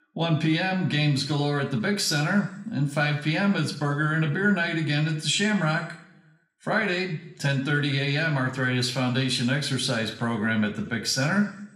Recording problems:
room echo; slight; dies away in 0.6 s
off-mic speech; somewhat distant

